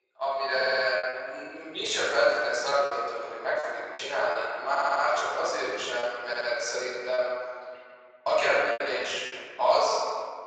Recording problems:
room echo; strong; dies away in 1.9 s
off-mic speech; far
thin; very; fading below 450 Hz
garbled, watery; slightly; nothing above 7.5 kHz
choppy; very; 5% of the speech affected
audio stuttering; at 0.5 s, at 4.5 s and at 6.5 s

